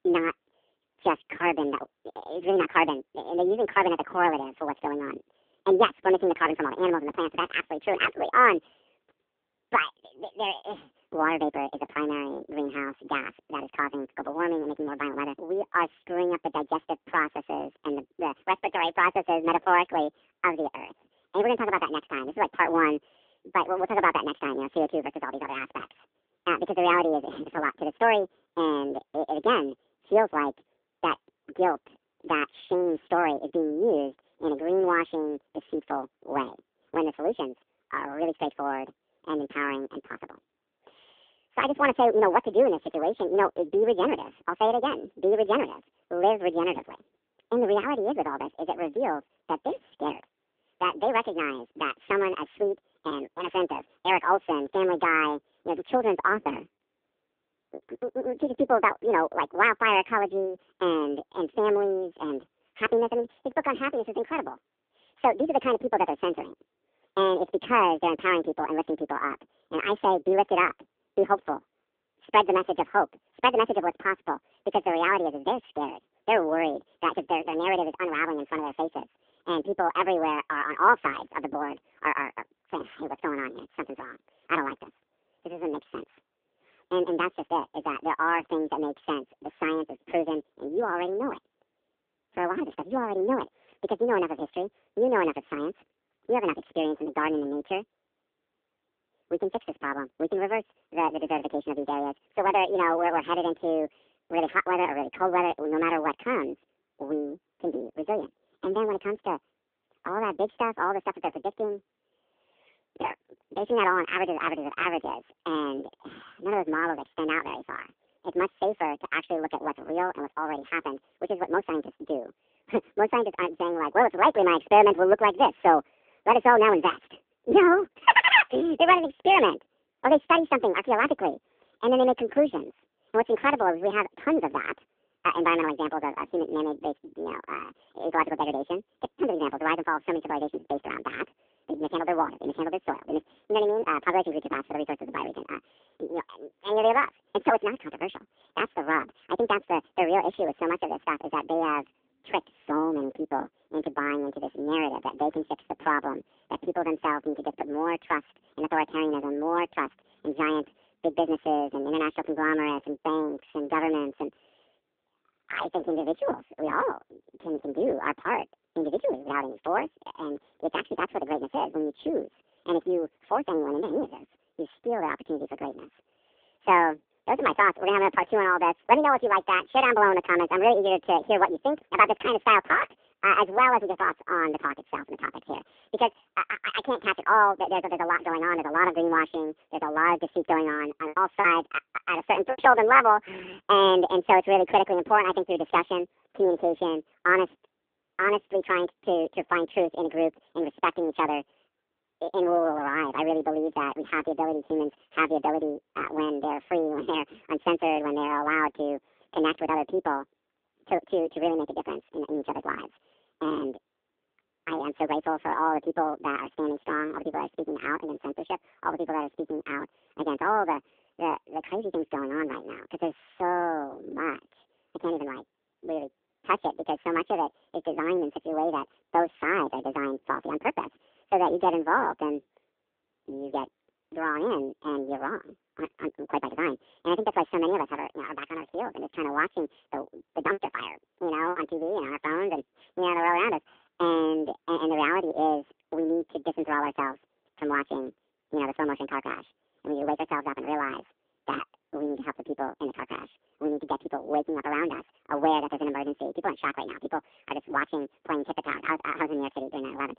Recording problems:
phone-call audio; poor line; nothing above 3.5 kHz
wrong speed and pitch; too fast and too high; 1.7 times normal speed
choppy; very; at 58 s, from 3:11 to 3:13 and from 4:01 to 4:02; 9% of the speech affected

